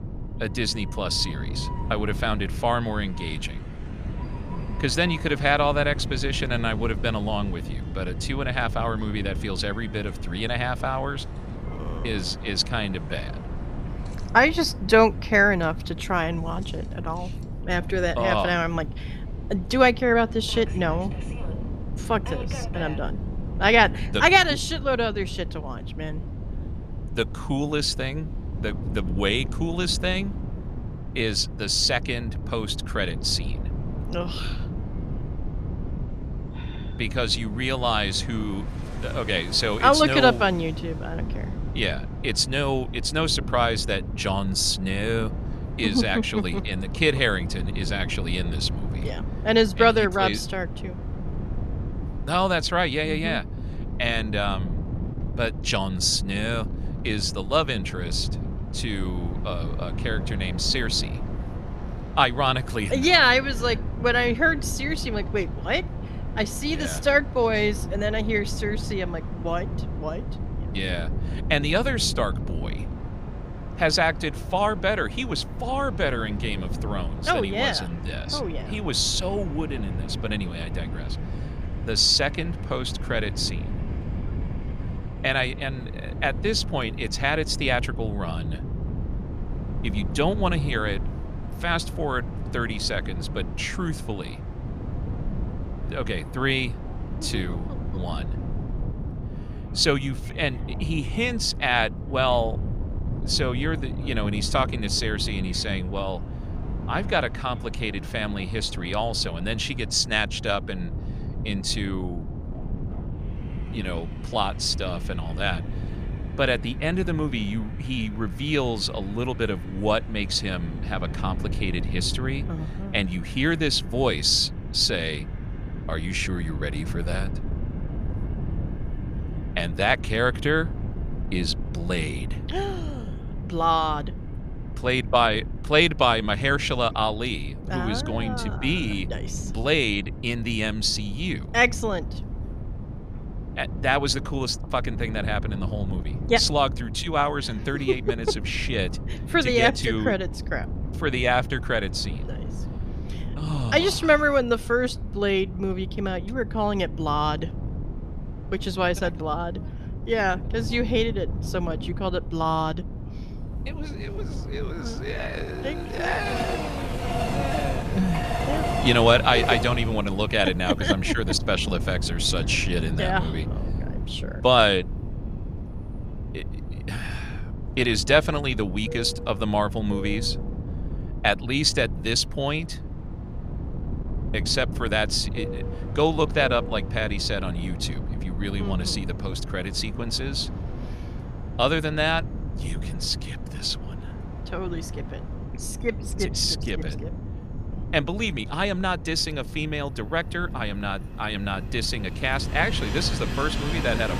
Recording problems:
train or aircraft noise; noticeable; throughout; 15 dB below the speech
wind noise on the microphone; occasional gusts; 20 dB below the speech

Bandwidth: 15 kHz